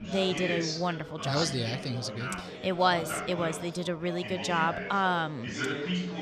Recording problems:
background chatter; loud; throughout; 4 voices, 5 dB below the speech

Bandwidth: 14 kHz